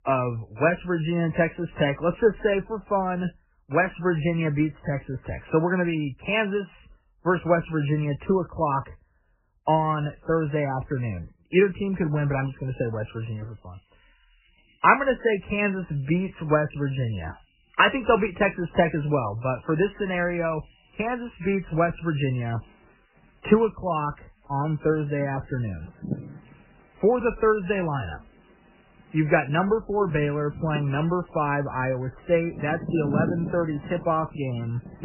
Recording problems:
garbled, watery; badly; nothing above 3 kHz
animal sounds; noticeable; from 14 s on; 10 dB below the speech

